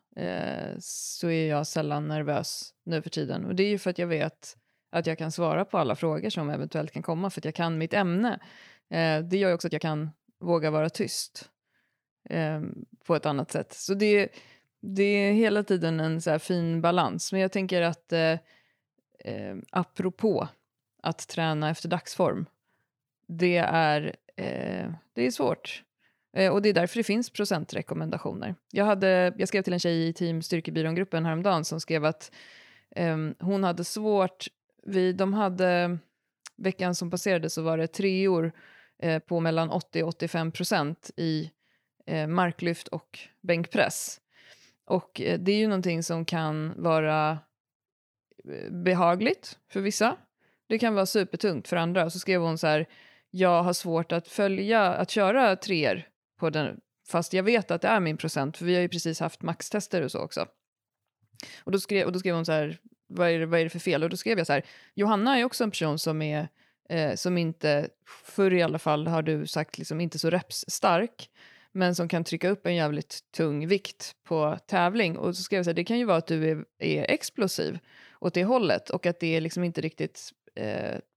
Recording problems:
uneven, jittery; strongly; from 9.5 s to 1:12

